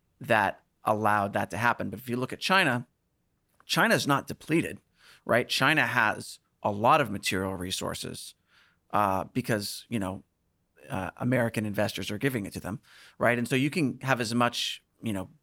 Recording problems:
none

